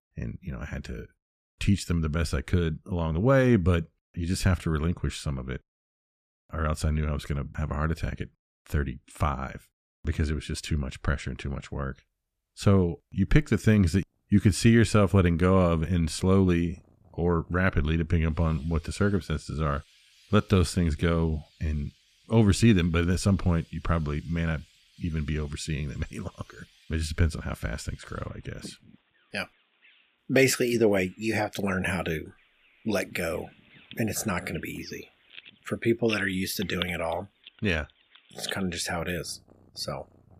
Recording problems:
animal sounds; noticeable; from 14 s on; 20 dB below the speech

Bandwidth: 14.5 kHz